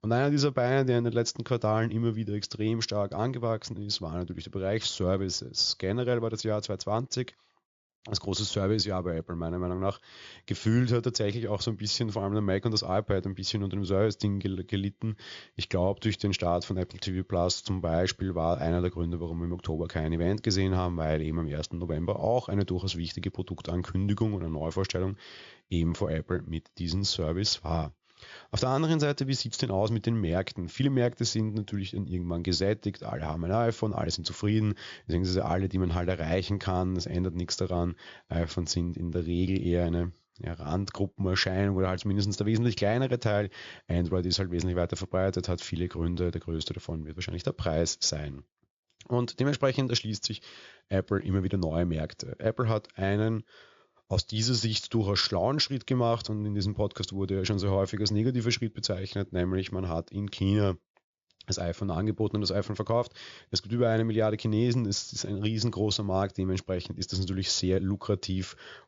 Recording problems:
high frequencies cut off; noticeable; nothing above 7 kHz

